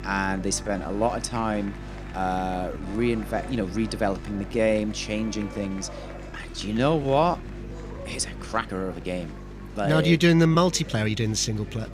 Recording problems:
murmuring crowd; noticeable; throughout; 20 dB below the speech
electrical hum; faint; throughout; 50 Hz, 25 dB below the speech
background music; faint; until 7.5 s; 25 dB below the speech
uneven, jittery; strongly; from 0.5 to 11 s

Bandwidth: 15.5 kHz